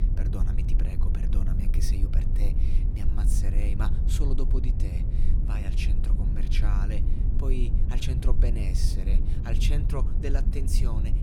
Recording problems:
low rumble; loud; throughout; 3 dB below the speech

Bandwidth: 18 kHz